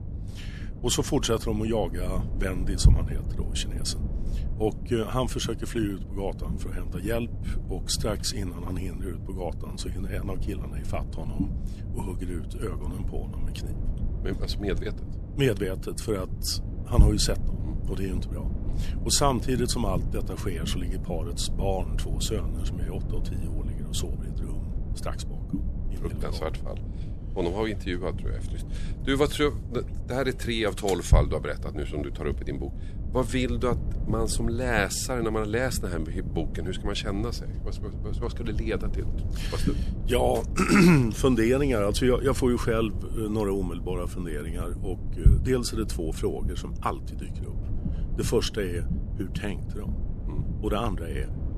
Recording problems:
low rumble; noticeable; throughout; 15 dB below the speech

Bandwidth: 13.5 kHz